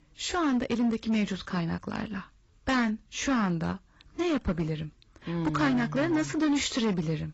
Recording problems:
garbled, watery; badly; nothing above 7.5 kHz
distortion; slight; 10% of the sound clipped

